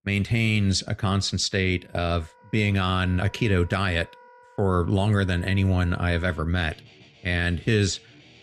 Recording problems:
background music; faint; from 2 s on; 25 dB below the speech

